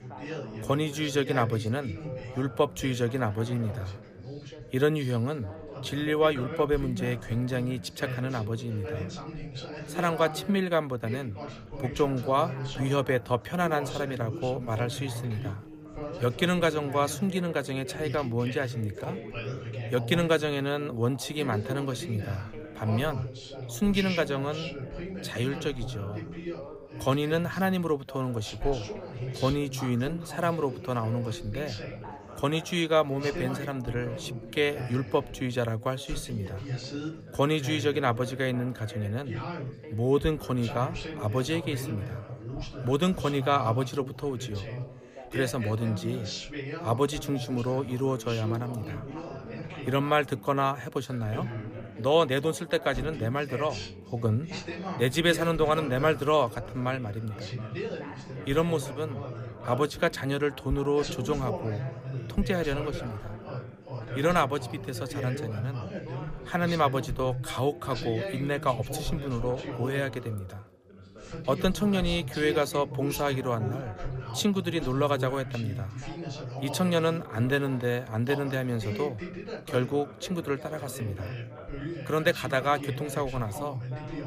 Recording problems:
background chatter; loud; throughout; 3 voices, 9 dB below the speech

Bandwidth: 15 kHz